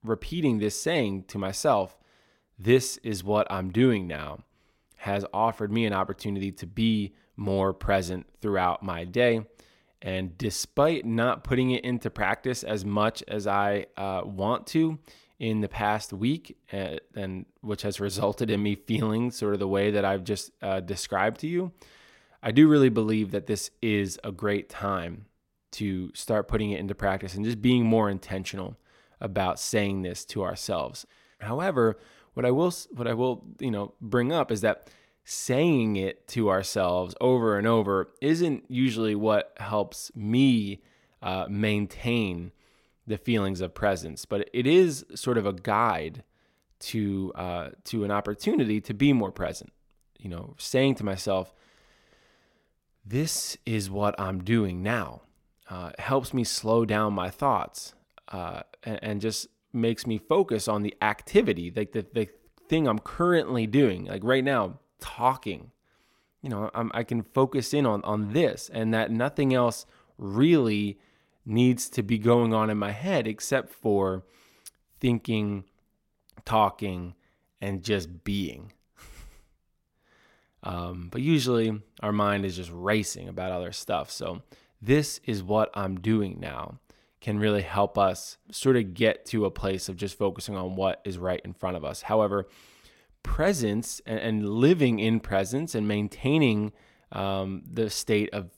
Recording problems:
none

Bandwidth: 16.5 kHz